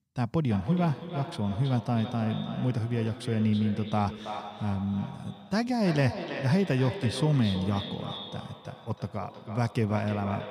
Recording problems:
echo of what is said; strong; throughout; 320 ms later, 10 dB below the speech

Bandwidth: 15.5 kHz